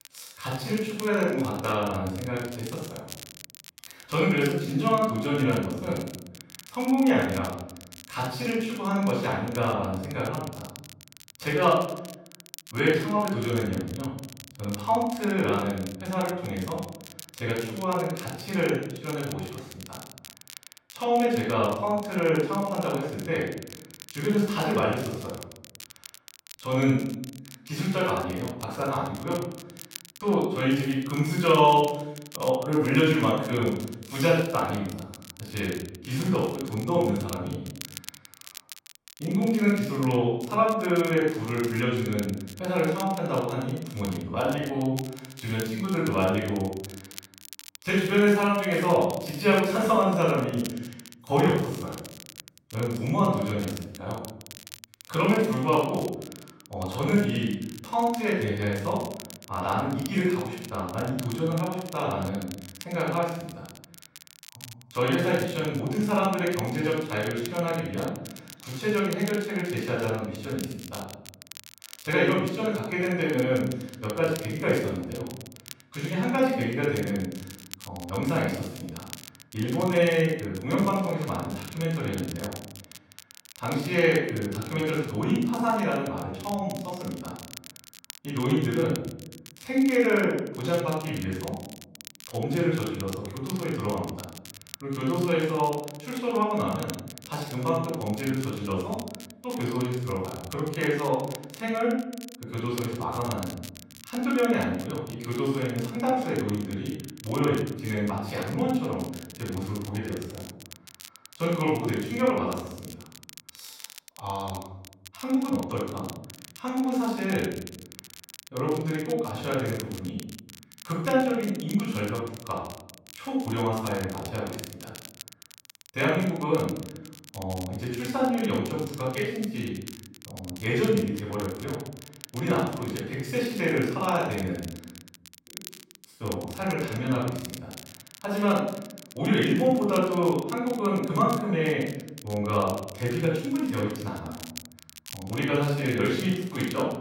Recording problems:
room echo; strong; dies away in 0.8 s
off-mic speech; far
crackle, like an old record; noticeable; 15 dB below the speech

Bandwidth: 16 kHz